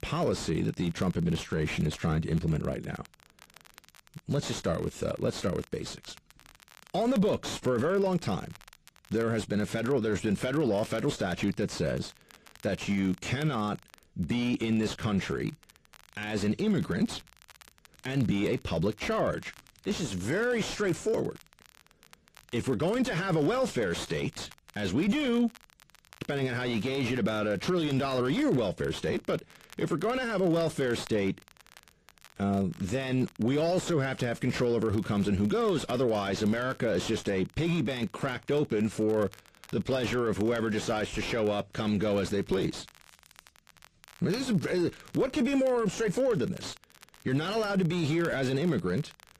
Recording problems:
distortion; slight; 10 dB below the speech
garbled, watery; slightly; nothing above 13.5 kHz
crackle, like an old record; faint; 25 dB below the speech

